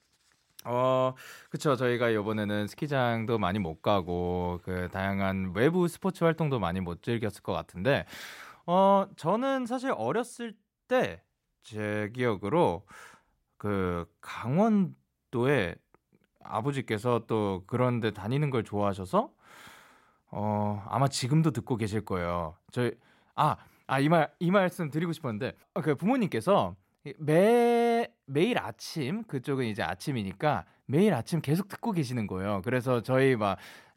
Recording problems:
none

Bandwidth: 16 kHz